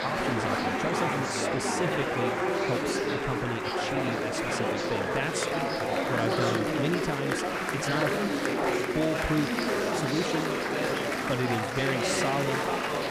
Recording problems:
chatter from many people; very loud; throughout; 4 dB above the speech

